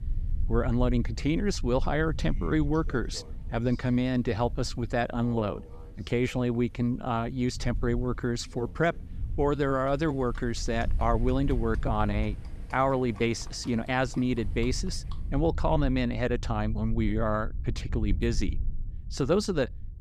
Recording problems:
animal sounds; faint; until 15 s; 25 dB below the speech
low rumble; faint; throughout; 25 dB below the speech

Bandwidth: 14.5 kHz